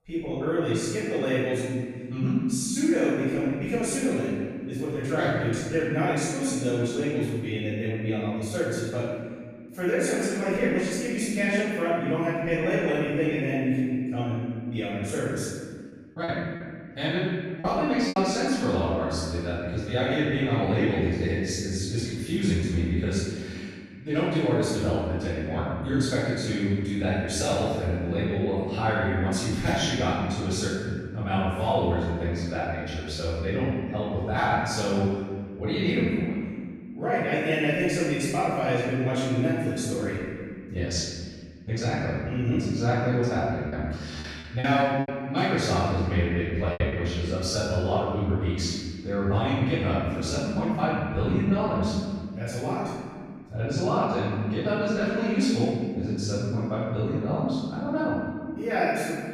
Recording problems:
room echo; strong; dies away in 1.9 s
off-mic speech; far
choppy; very; from 16 to 18 s and from 44 to 47 s; 9% of the speech affected

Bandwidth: 15 kHz